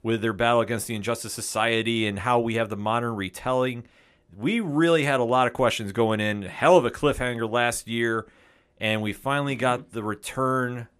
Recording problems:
none

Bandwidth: 14.5 kHz